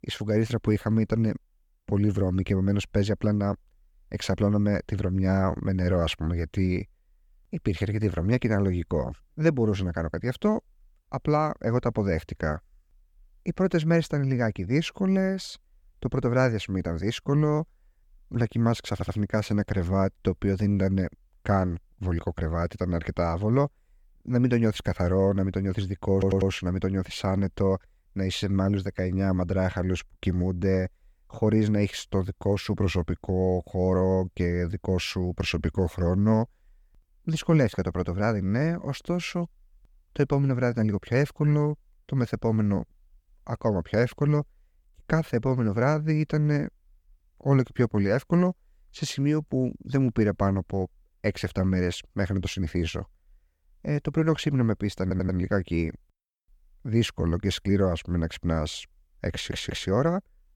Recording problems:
audio stuttering; 4 times, first at 19 s

